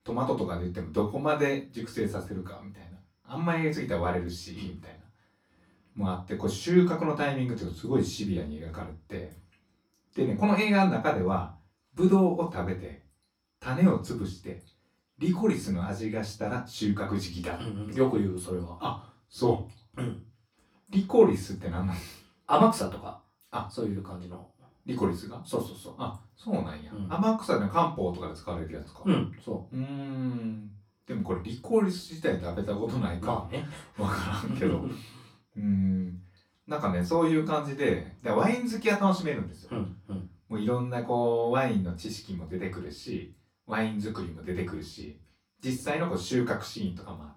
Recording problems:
off-mic speech; far
room echo; slight; dies away in 0.3 s

